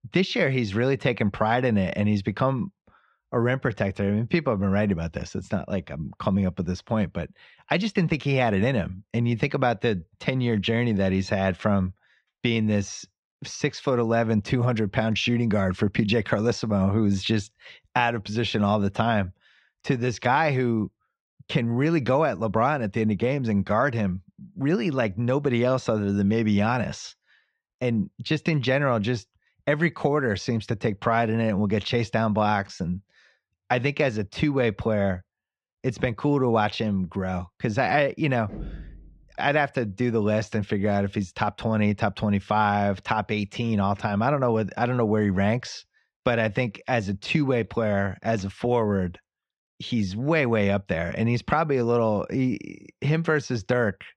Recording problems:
muffled; slightly; fading above 3 kHz
door banging; faint; at 38 s; peak 15 dB below the speech

